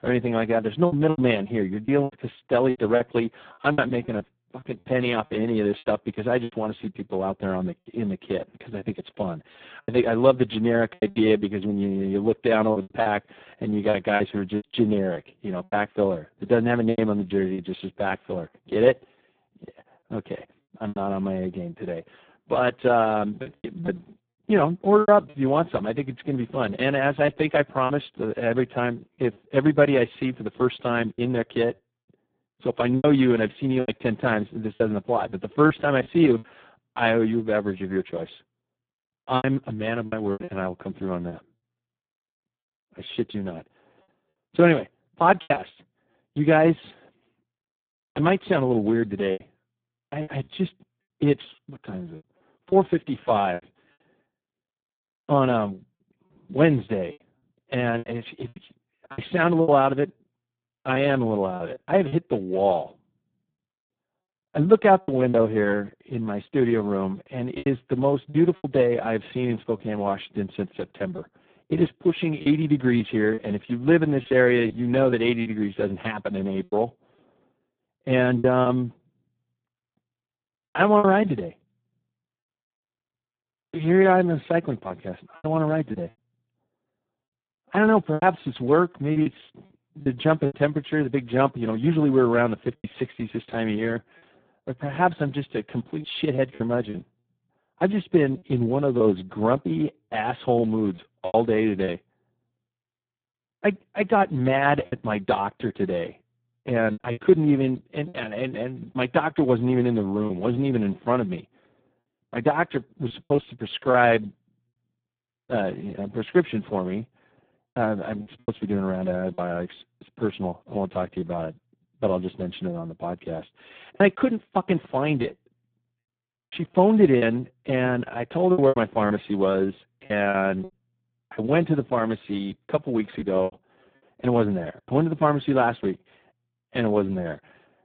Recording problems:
phone-call audio; poor line; nothing above 3.5 kHz
choppy; very; 6% of the speech affected

